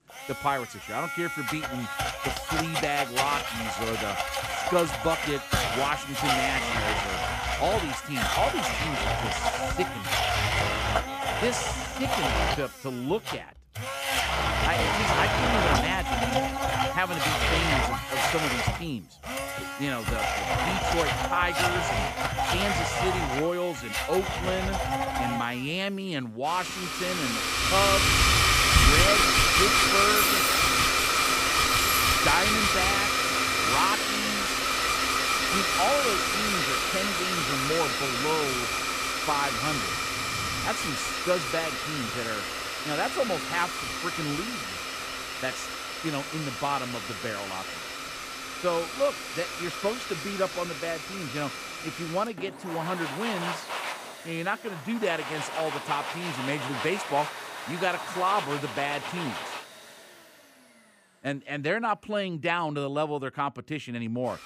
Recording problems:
household noises; very loud; throughout; 5 dB above the speech
jangling keys; loud; from 29 to 32 s; peak 4 dB above the speech

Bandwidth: 15 kHz